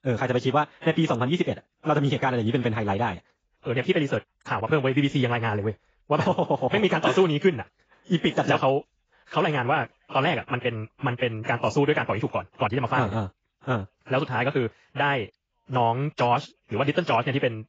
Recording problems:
garbled, watery; badly; nothing above 7.5 kHz
wrong speed, natural pitch; too fast; 1.6 times normal speed

